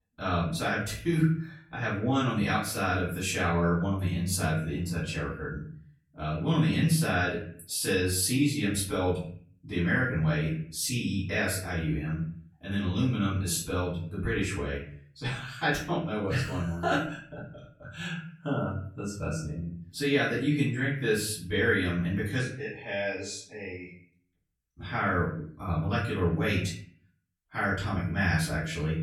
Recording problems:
off-mic speech; far
room echo; noticeable; dies away in 0.5 s

